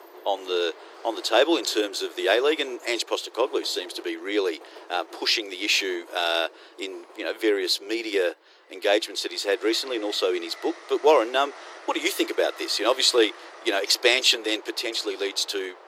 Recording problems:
thin; very; fading below 350 Hz
train or aircraft noise; faint; throughout; 20 dB below the speech

